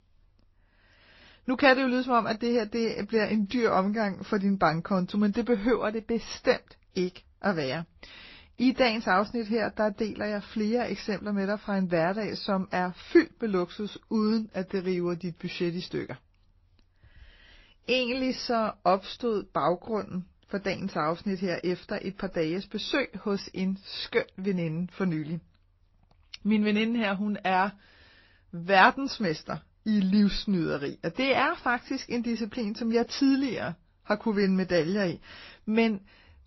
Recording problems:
garbled, watery; slightly; nothing above 5.5 kHz

